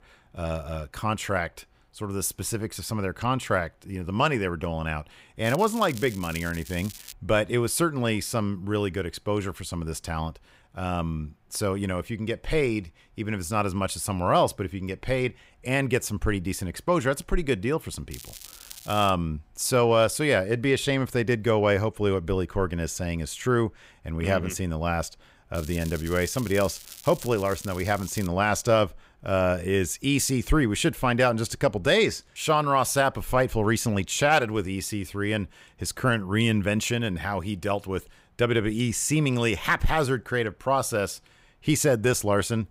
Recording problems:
crackling; noticeable; from 5.5 to 7 s, at 18 s and from 26 to 28 s; 15 dB below the speech

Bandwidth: 15.5 kHz